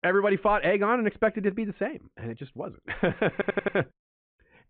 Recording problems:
high frequencies cut off; severe; nothing above 4 kHz
muffled; very slightly; fading above 2.5 kHz
audio stuttering; at 3.5 s

